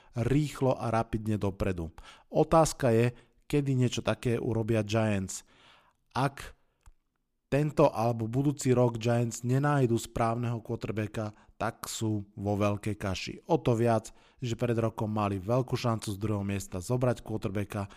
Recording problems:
none

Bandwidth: 15 kHz